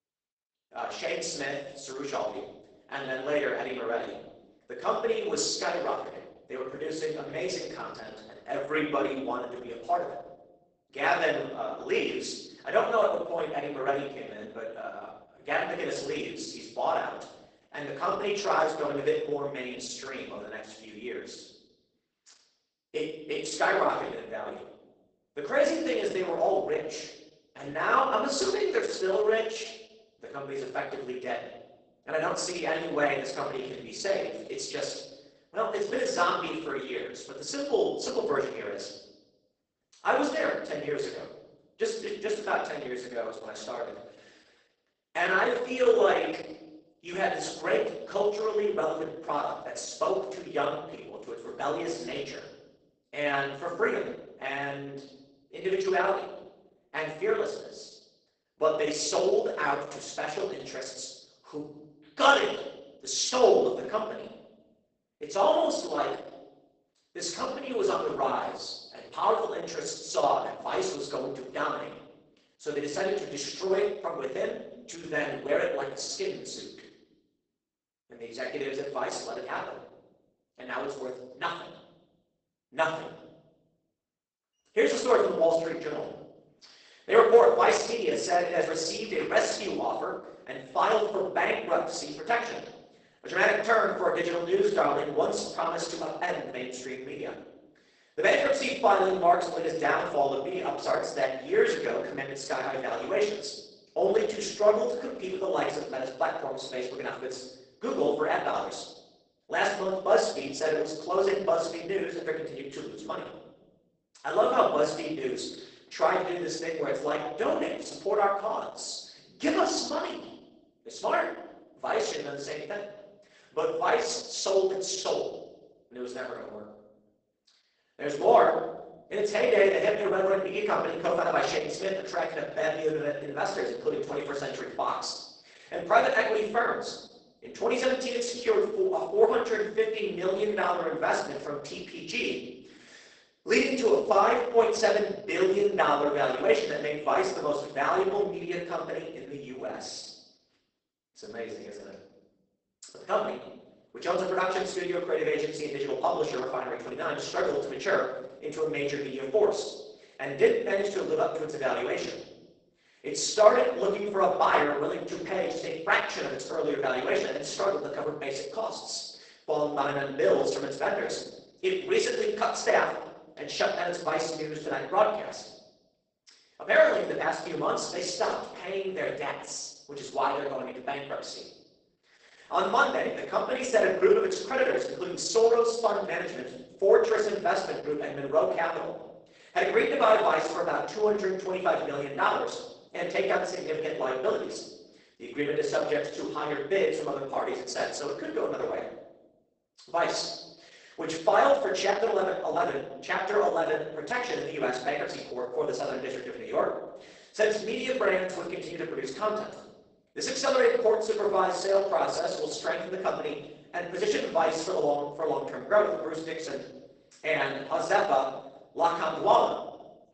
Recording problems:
off-mic speech; far
garbled, watery; badly; nothing above 8 kHz
room echo; noticeable; dies away in 0.8 s
thin; somewhat; fading below 350 Hz

